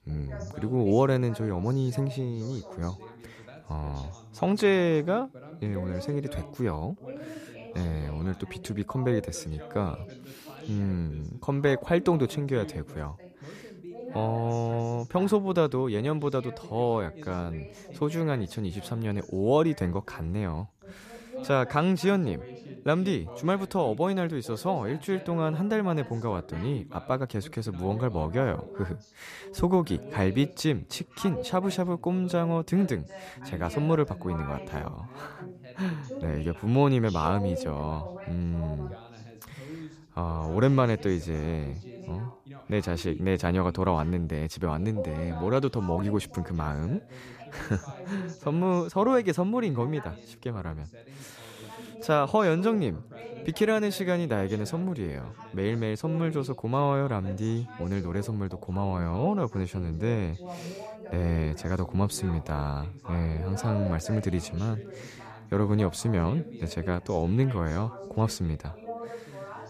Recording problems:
background chatter; noticeable; throughout; 2 voices, 15 dB below the speech

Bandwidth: 14.5 kHz